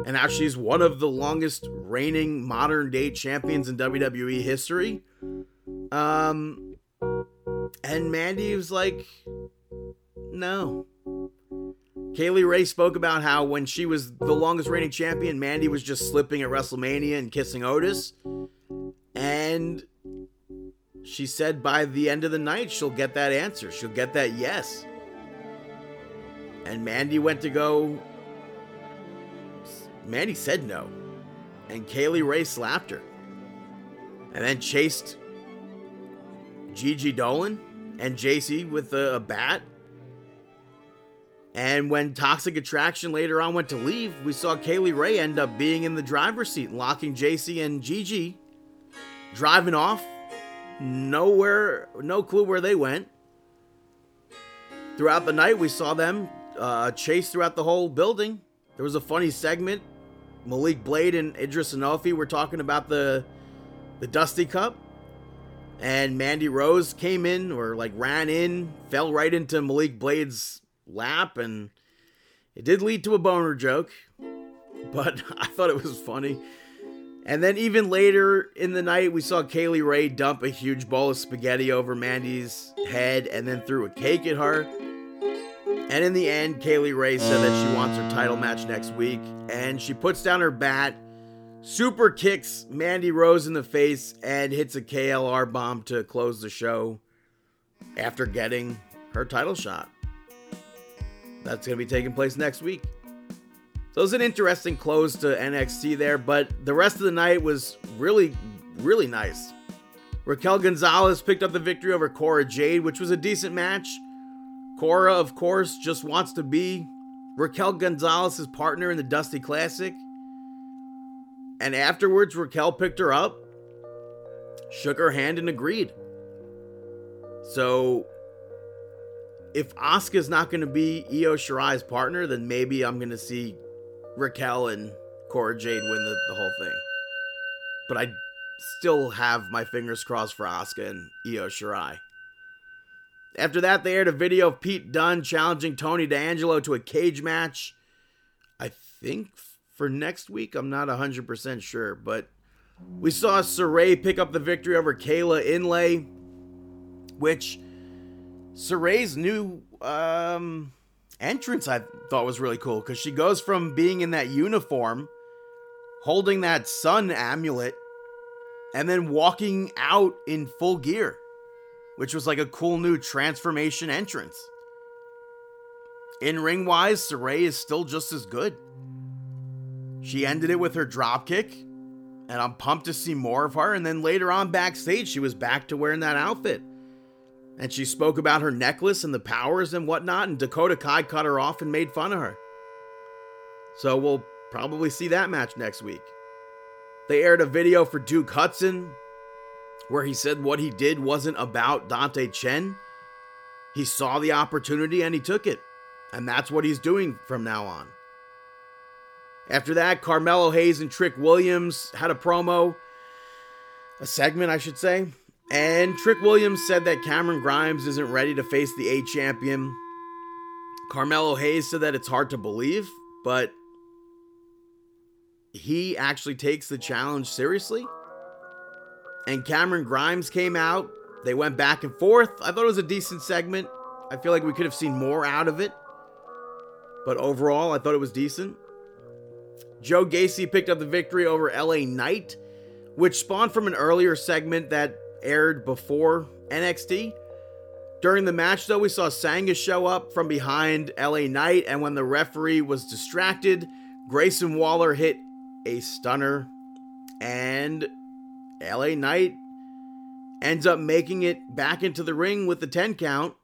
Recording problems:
background music; noticeable; throughout; 15 dB below the speech

